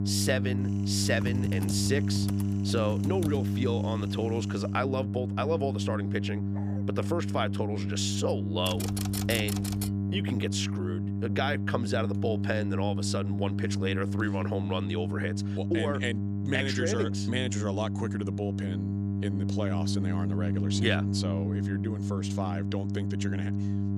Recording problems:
electrical hum; loud; throughout; 50 Hz, 6 dB below the speech
keyboard typing; noticeable; from 1 to 4 s and from 8.5 to 10 s; peak 2 dB below the speech
dog barking; faint; at 6.5 s; peak 15 dB below the speech

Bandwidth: 14.5 kHz